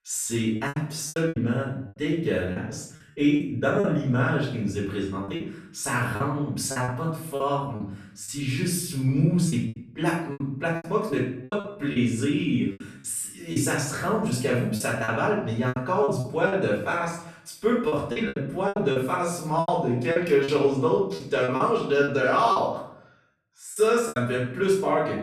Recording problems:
off-mic speech; far
room echo; noticeable; dies away in 0.6 s
choppy; very; 10% of the speech affected

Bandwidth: 13.5 kHz